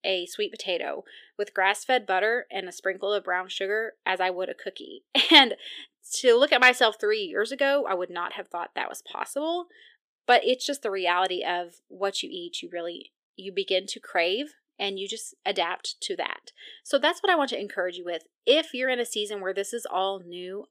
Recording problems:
thin; somewhat; fading below 450 Hz

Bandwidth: 15 kHz